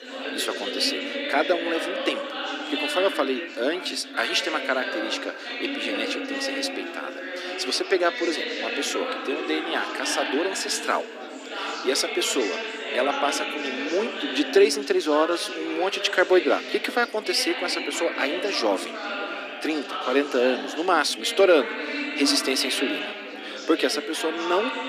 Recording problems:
thin; somewhat; fading below 250 Hz
chatter from many people; loud; throughout; 5 dB below the speech

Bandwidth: 15 kHz